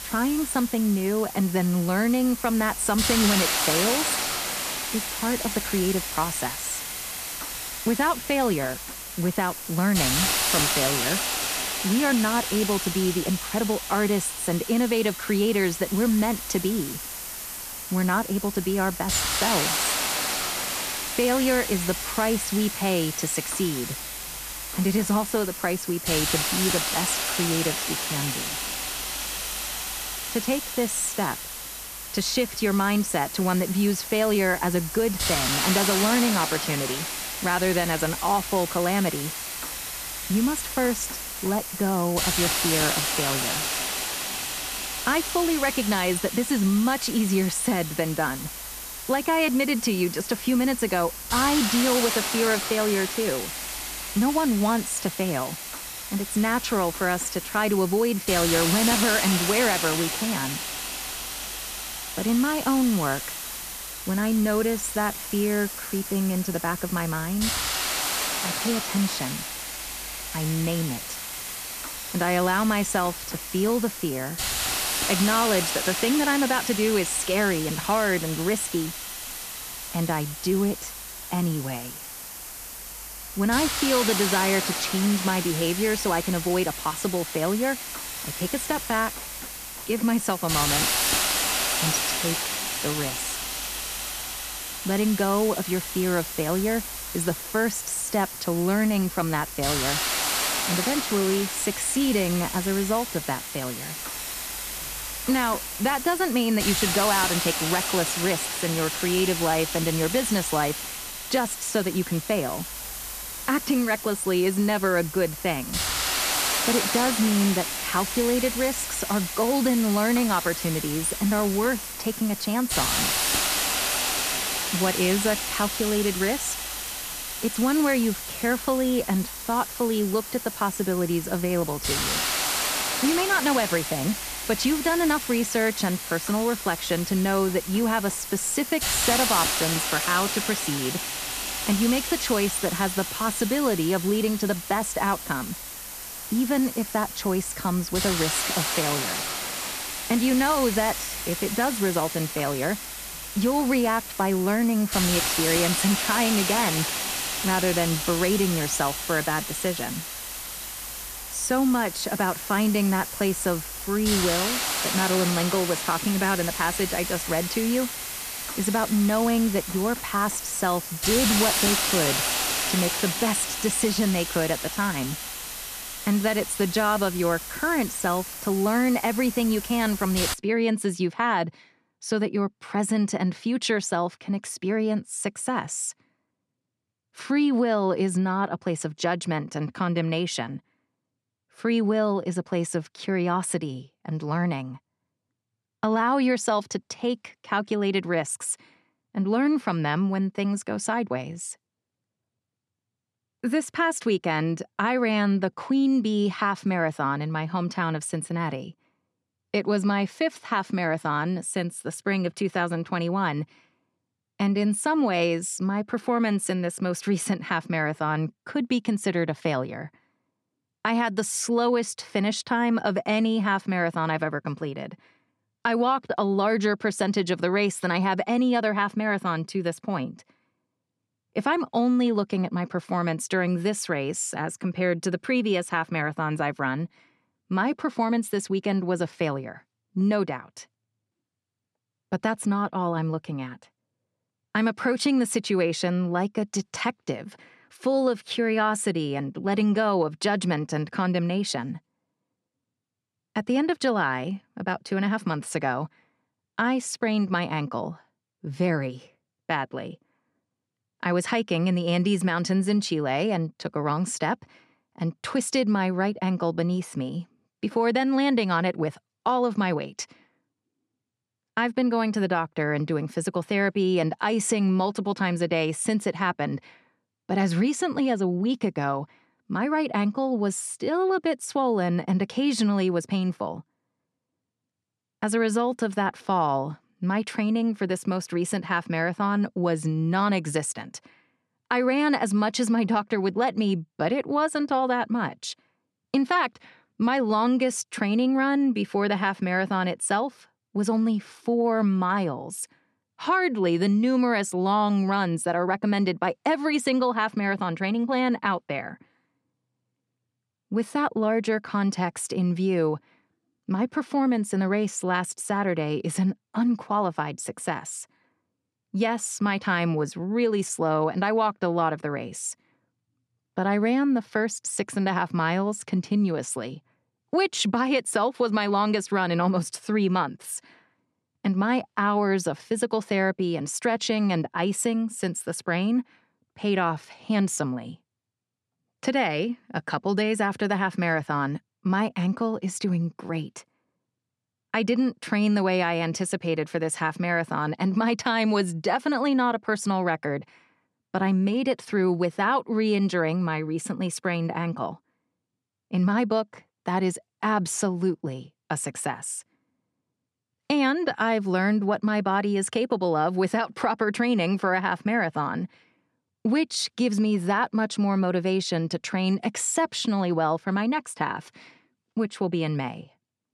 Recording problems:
hiss; loud; until 3:00; 3 dB below the speech

